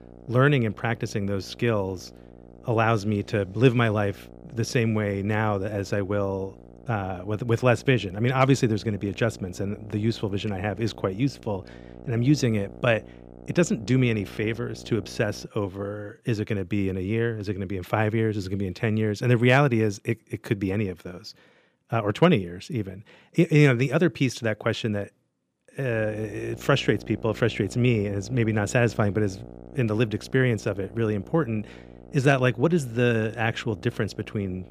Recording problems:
electrical hum; faint; until 15 s and from 26 s on; 60 Hz, 20 dB below the speech

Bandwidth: 15 kHz